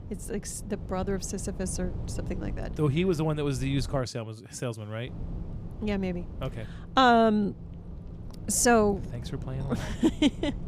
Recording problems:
low rumble; faint; until 4 s and from 5 s on; 20 dB below the speech

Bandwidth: 15 kHz